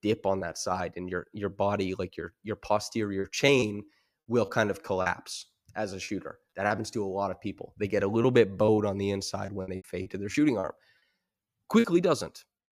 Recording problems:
choppy; very; from 3 to 5 s, at 6 s and from 8 to 12 s; 11% of the speech affected

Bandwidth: 15 kHz